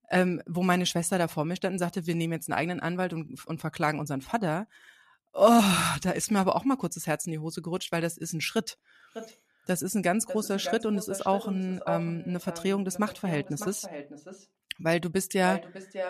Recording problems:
echo of what is said; strong; from 9 s on; 600 ms later, 10 dB below the speech

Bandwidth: 14.5 kHz